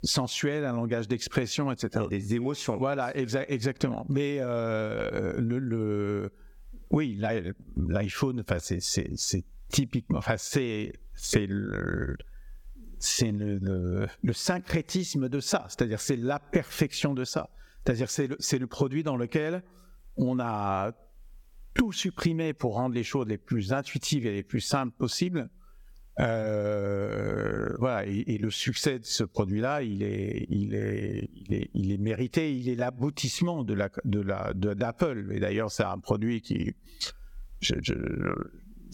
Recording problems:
squashed, flat; somewhat

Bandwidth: 17.5 kHz